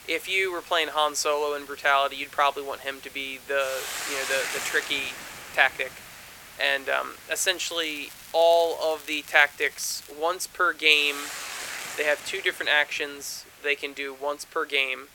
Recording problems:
thin; very; fading below 450 Hz
hiss; noticeable; throughout; 15 dB below the speech
crackling; faint; from 7.5 to 10 s; 20 dB below the speech

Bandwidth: 17 kHz